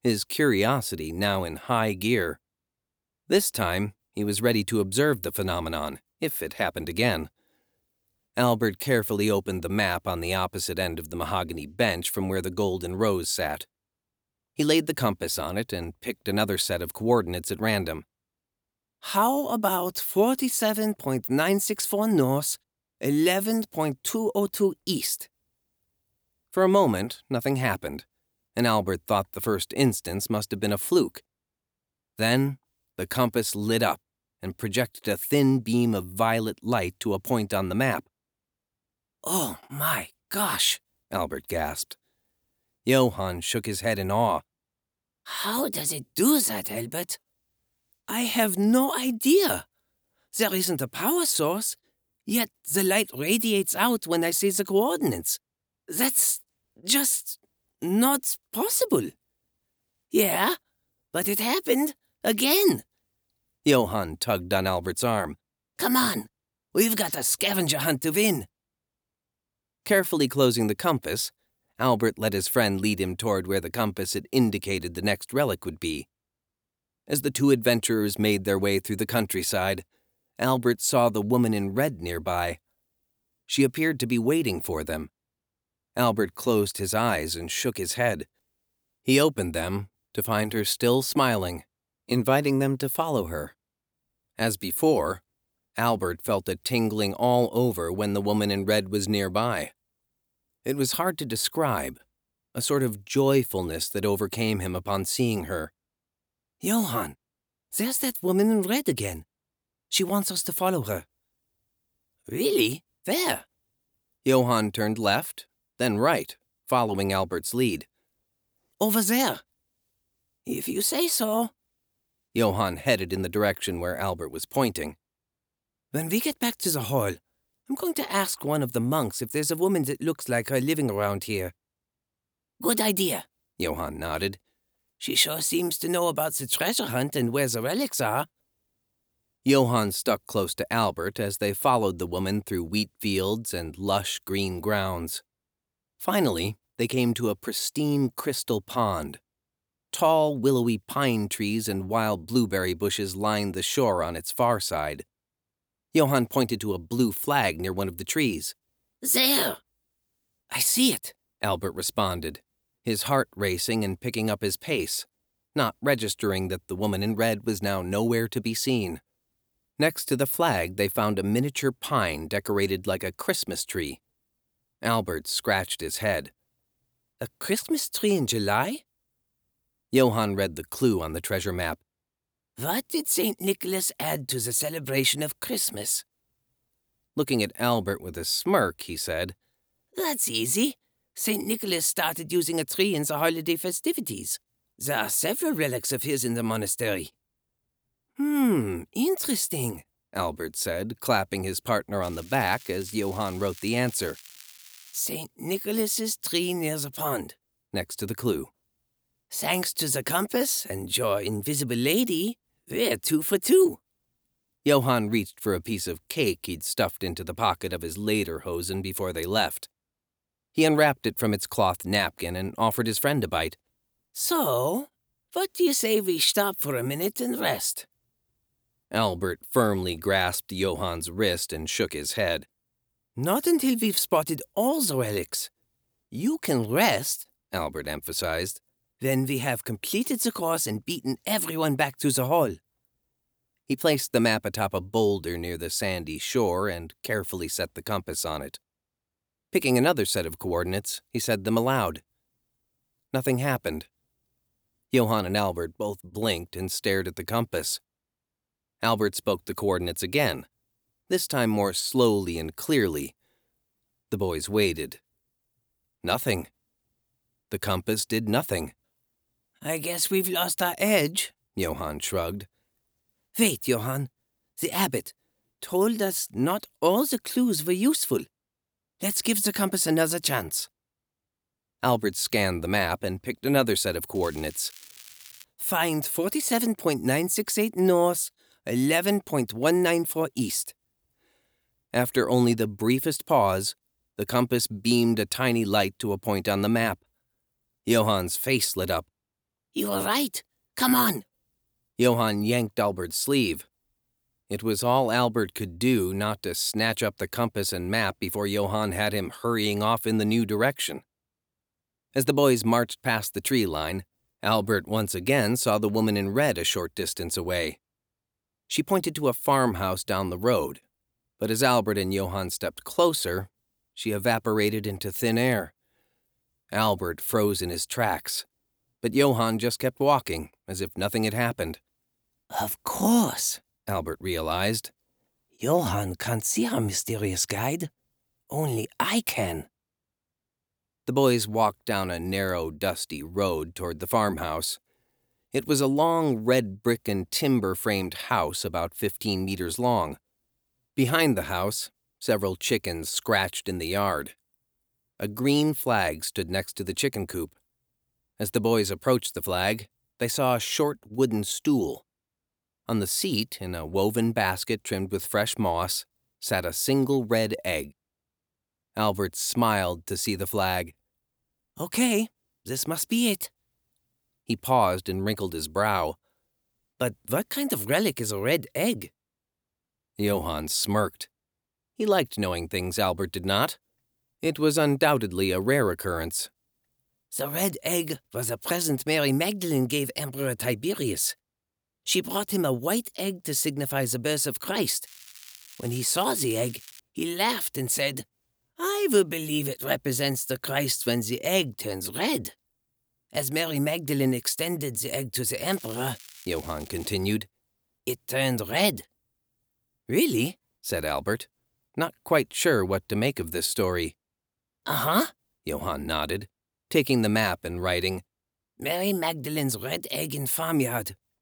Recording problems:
crackling; noticeable; 4 times, first at 3:22; 20 dB below the speech

